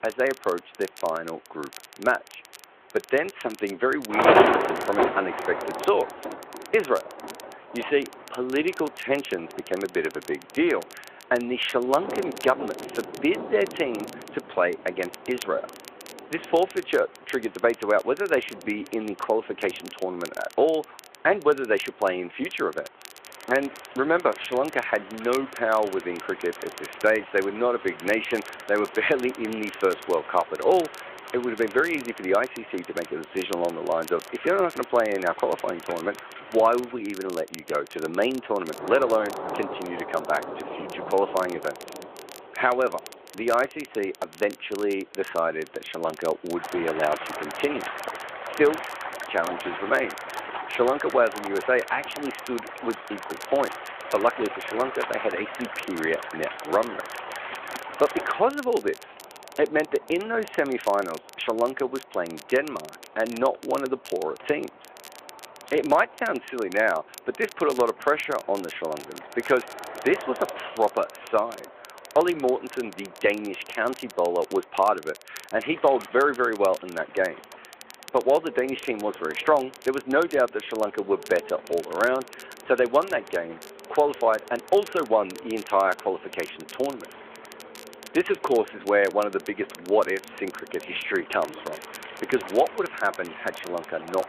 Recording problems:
phone-call audio
rain or running water; loud; throughout; 7 dB below the speech
crackle, like an old record; noticeable; 20 dB below the speech
traffic noise; faint; throughout; 20 dB below the speech

